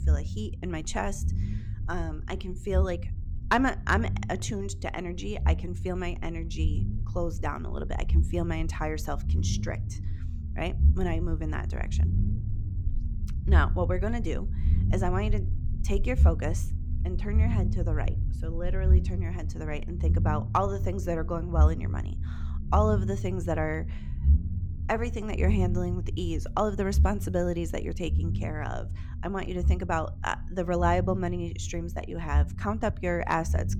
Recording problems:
low rumble; noticeable; throughout; 15 dB below the speech

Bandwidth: 18.5 kHz